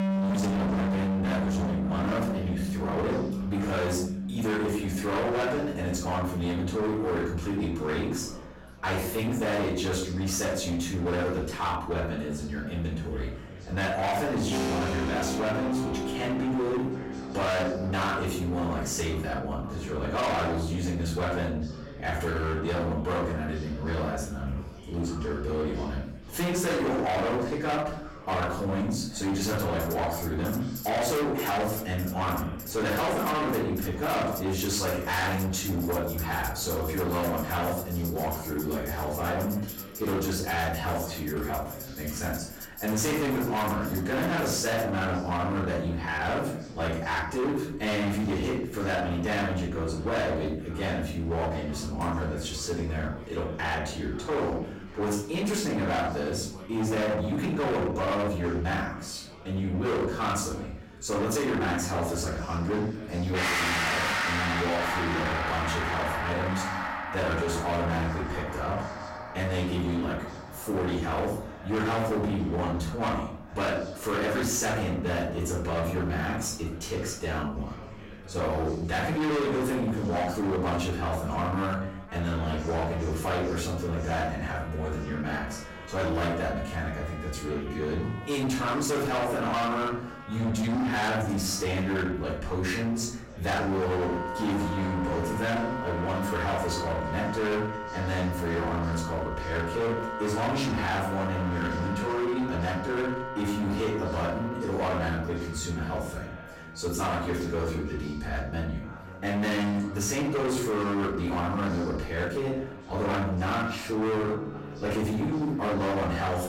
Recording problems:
distortion; heavy; 24% of the sound clipped
off-mic speech; far
room echo; noticeable; dies away in 0.5 s
chatter from many people; noticeable; throughout; 15 dB below the speech
background music; very faint; throughout; 5 dB below the speech

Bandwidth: 16 kHz